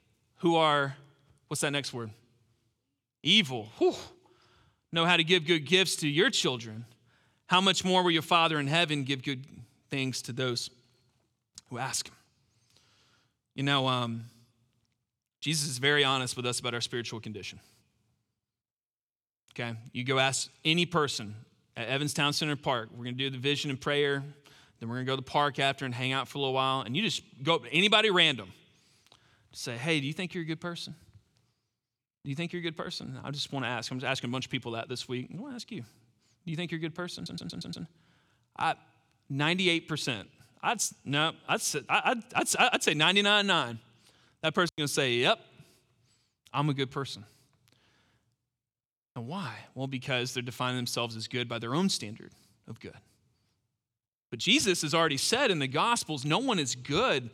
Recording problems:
audio stuttering; at 37 s

